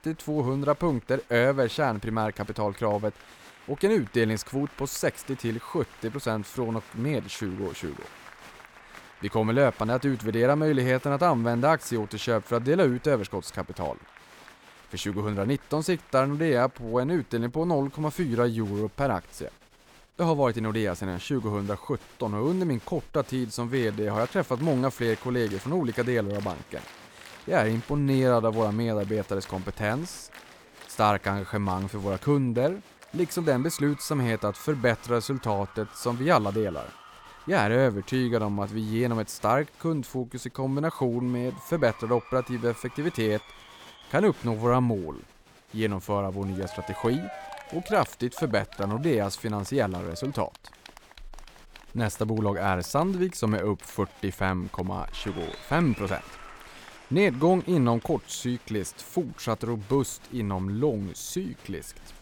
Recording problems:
crowd noise; faint; throughout; 20 dB below the speech

